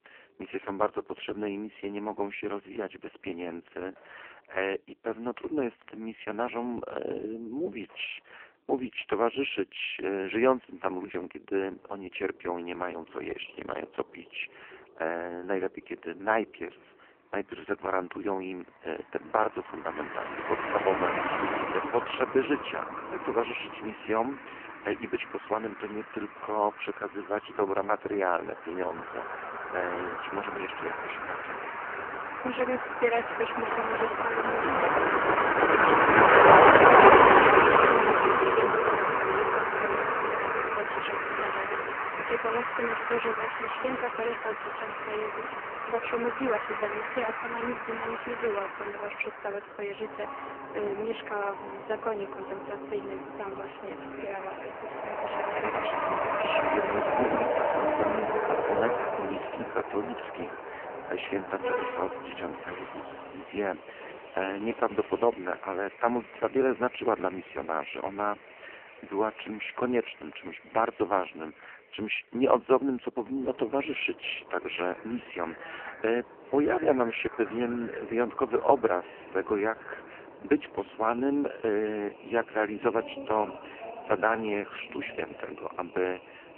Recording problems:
phone-call audio; poor line; nothing above 3 kHz
traffic noise; very loud; throughout; 6 dB above the speech

